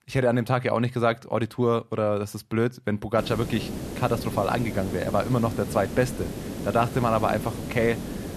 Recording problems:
hiss; loud; from 3 s on; 8 dB below the speech

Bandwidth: 13.5 kHz